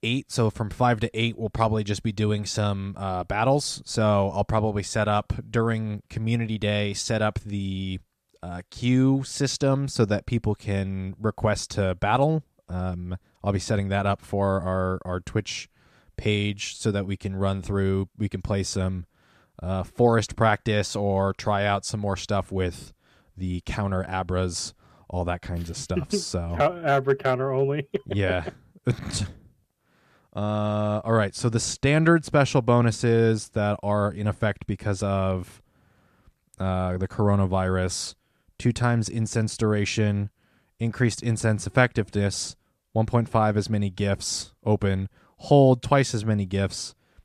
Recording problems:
none

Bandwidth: 14.5 kHz